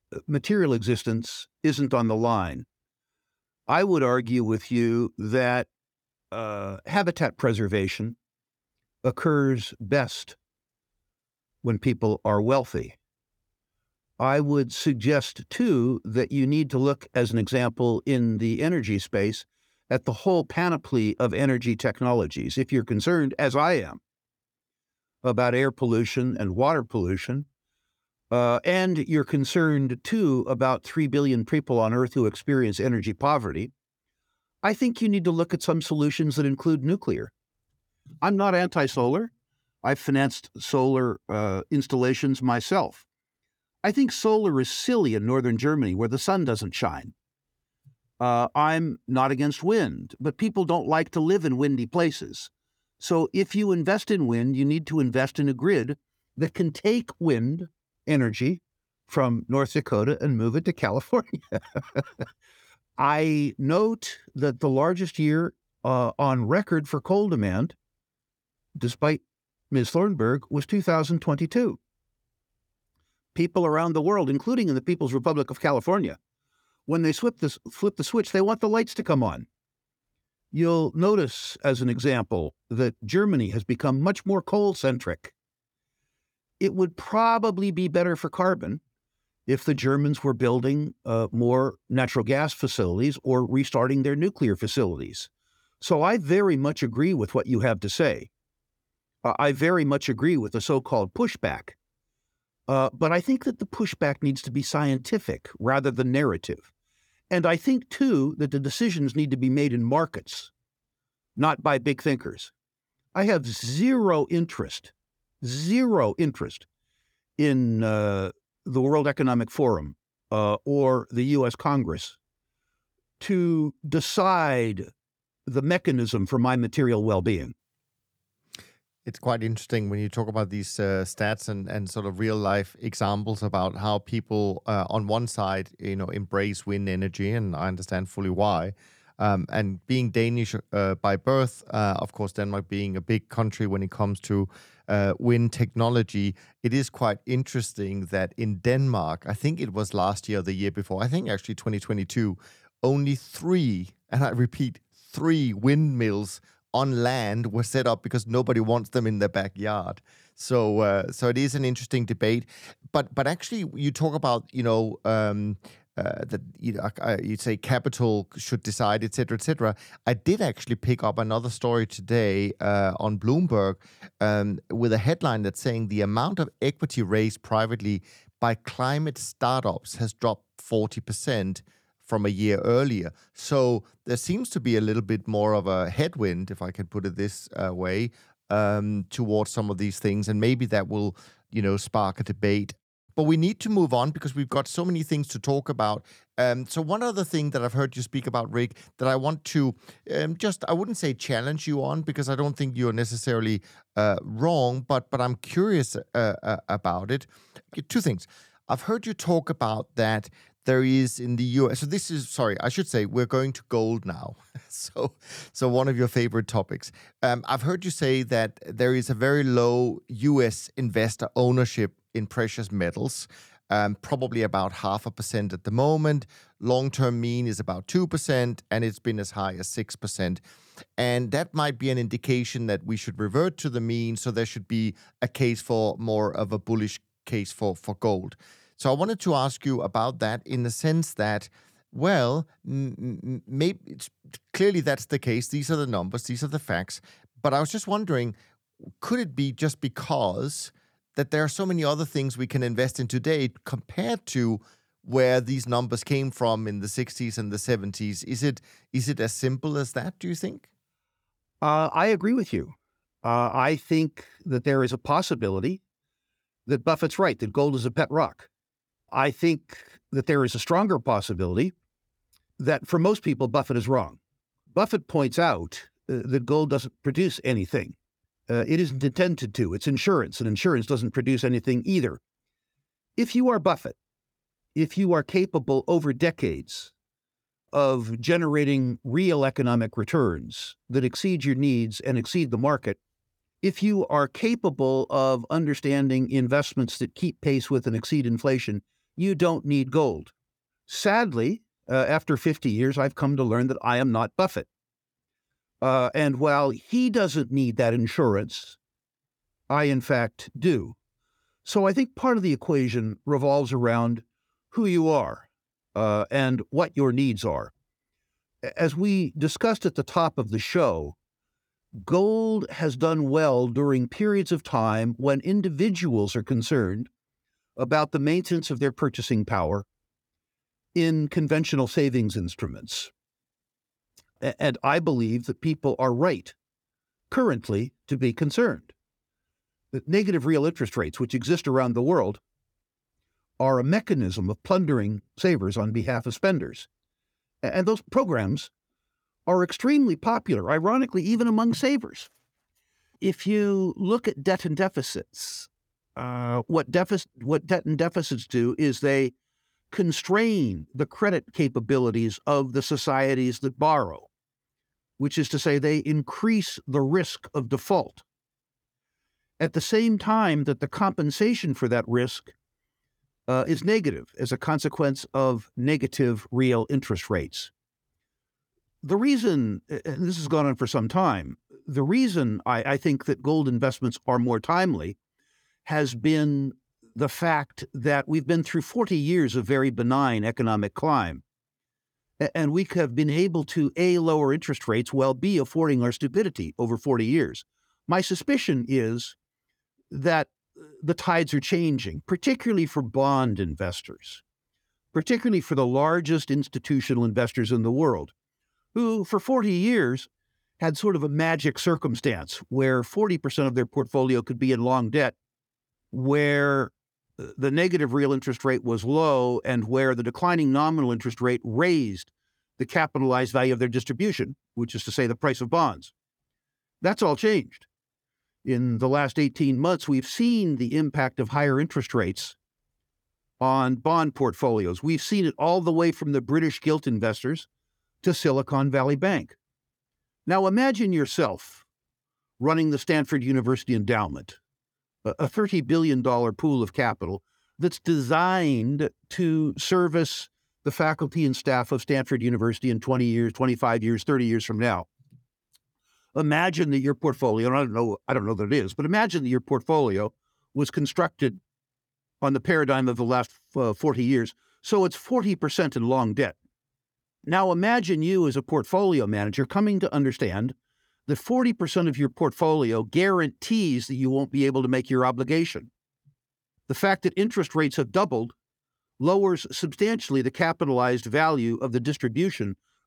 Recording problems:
none

